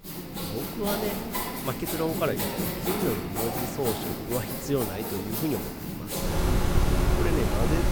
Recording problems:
machinery noise; very loud; throughout; 3 dB above the speech

